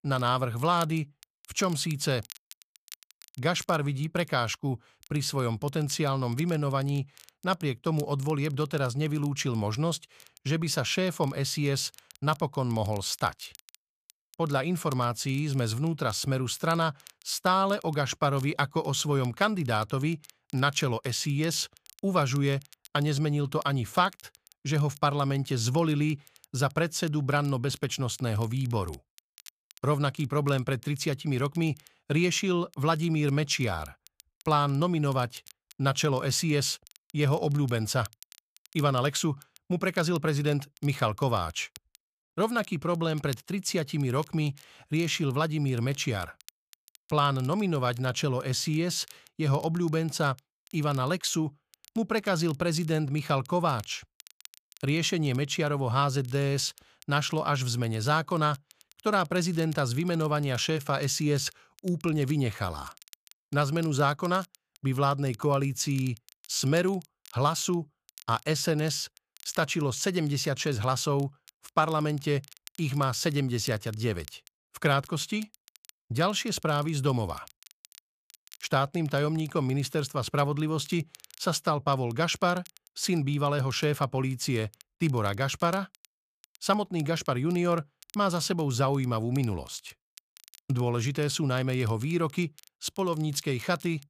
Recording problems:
crackle, like an old record; faint; 25 dB below the speech

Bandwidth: 14.5 kHz